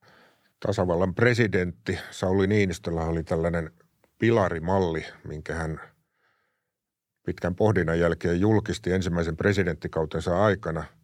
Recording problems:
none

